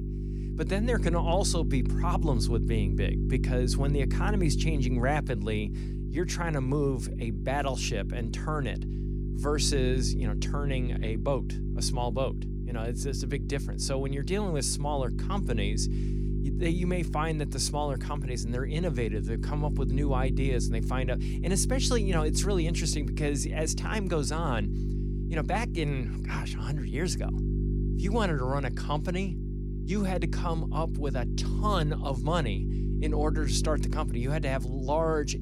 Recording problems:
electrical hum; loud; throughout; 50 Hz, 9 dB below the speech

